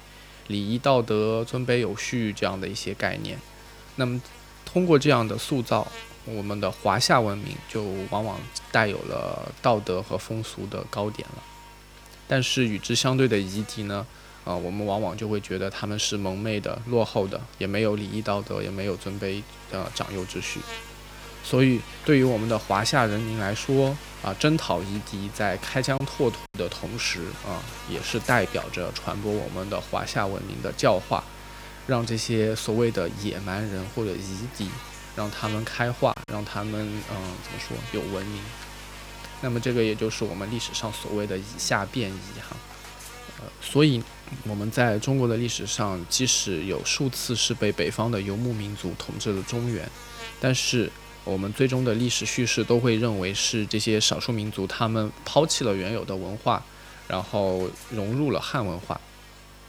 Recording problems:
electrical hum; noticeable; throughout; 50 Hz, 15 dB below the speech
high-pitched whine; faint; throughout; 5.5 kHz, 35 dB below the speech
choppy; occasionally; at 26 s and at 36 s; 3% of the speech affected

